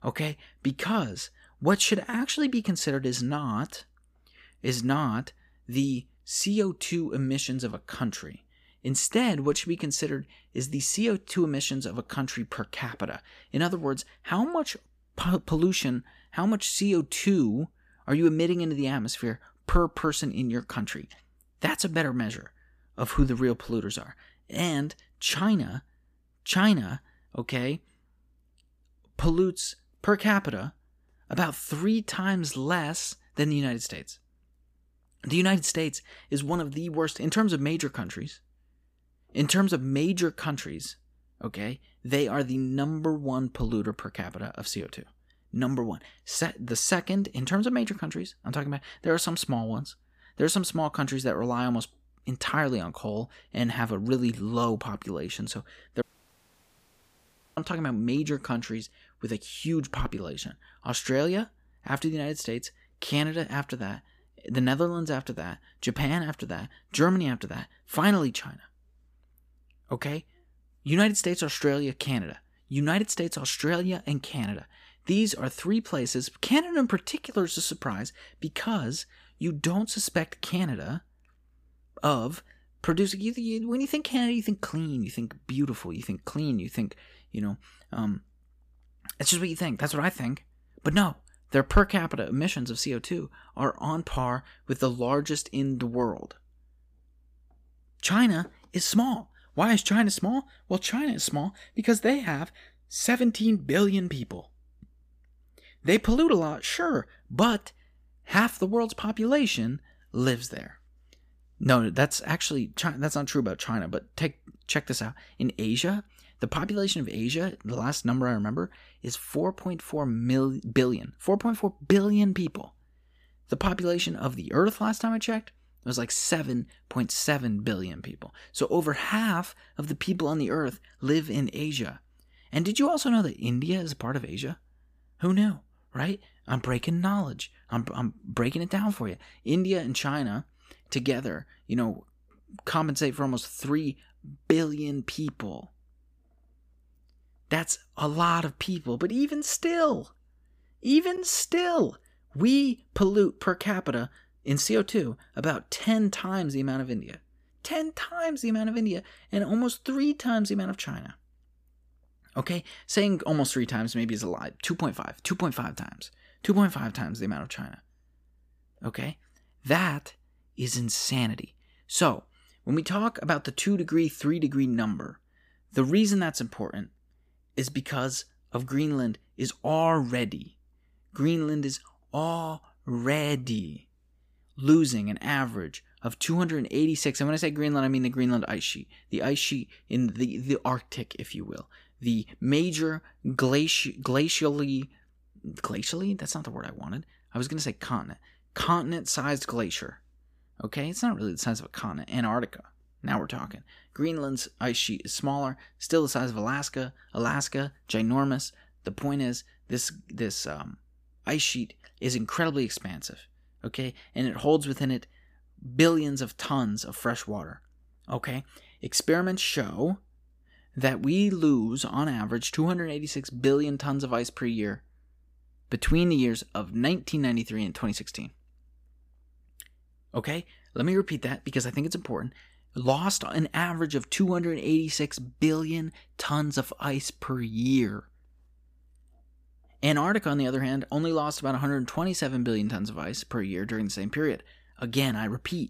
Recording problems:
audio cutting out; at 56 s for 1.5 s

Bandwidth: 15 kHz